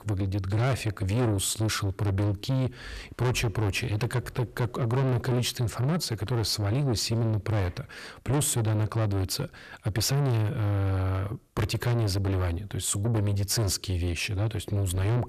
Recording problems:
distortion; heavy; 6 dB below the speech

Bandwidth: 14 kHz